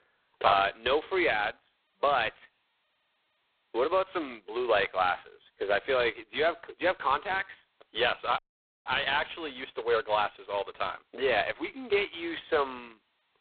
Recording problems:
phone-call audio; poor line; nothing above 4 kHz
audio cutting out; at 8.5 s

